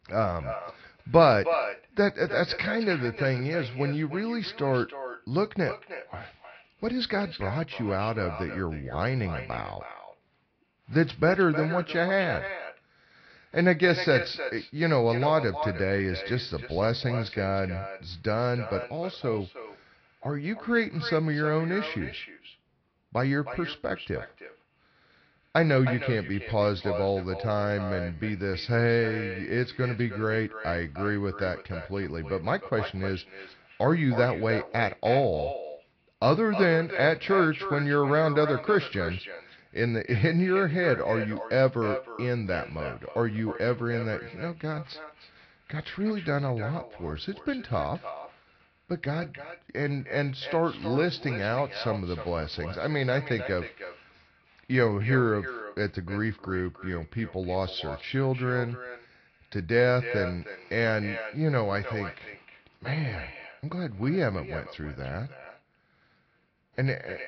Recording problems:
echo of what is said; strong; throughout; 310 ms later, 10 dB below the speech
high frequencies cut off; noticeable; nothing above 5 kHz
garbled, watery; slightly

